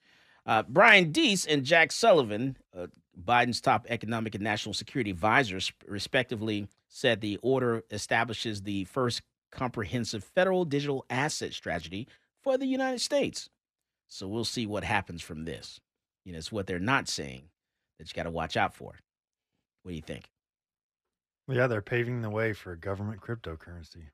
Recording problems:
none

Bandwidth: 14.5 kHz